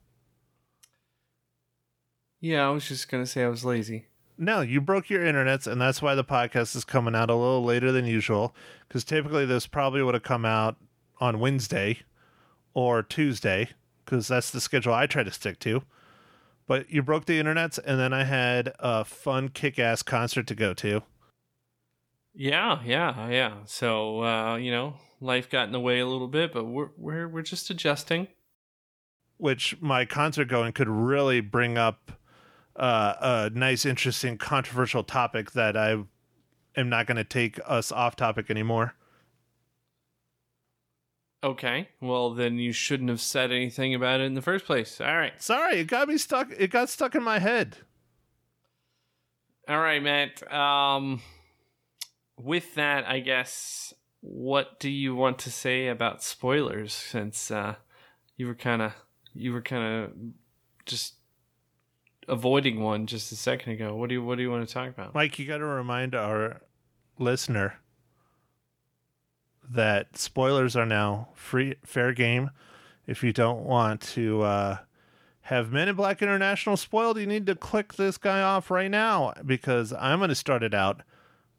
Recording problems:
none

